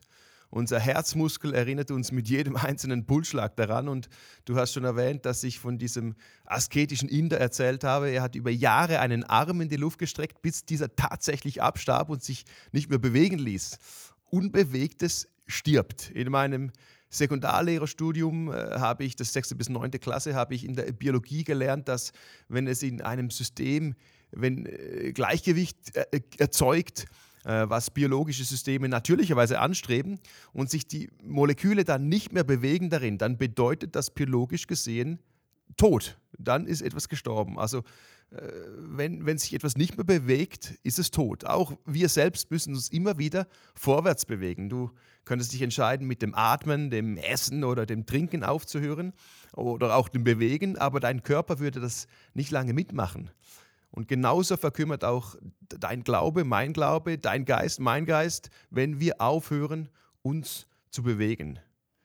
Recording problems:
none

